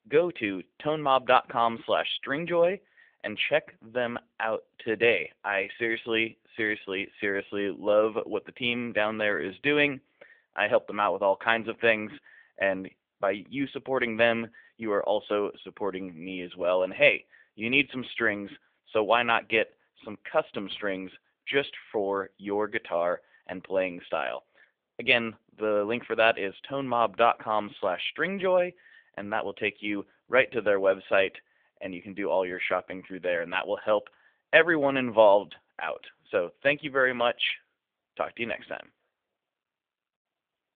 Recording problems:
phone-call audio; nothing above 3.5 kHz

